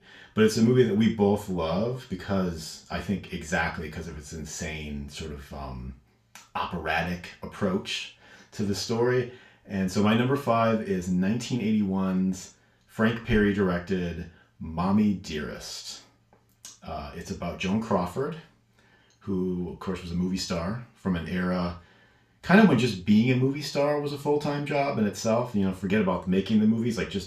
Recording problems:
off-mic speech; far
room echo; slight; dies away in 0.3 s

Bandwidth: 14.5 kHz